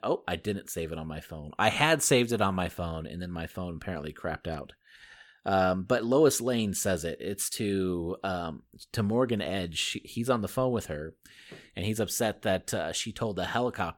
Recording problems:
none

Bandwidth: 17.5 kHz